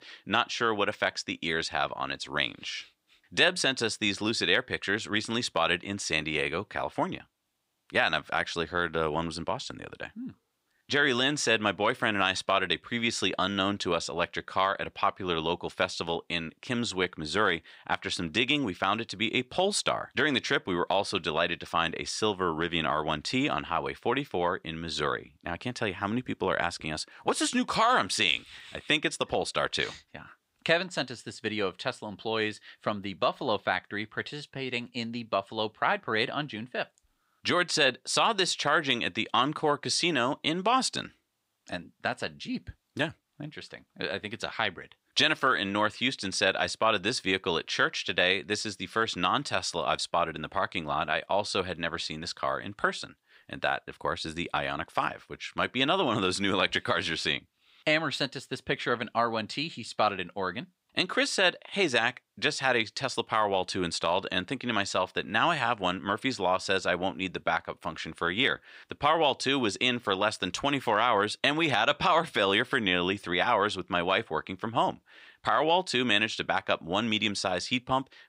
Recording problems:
thin; somewhat; fading below 500 Hz

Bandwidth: 15.5 kHz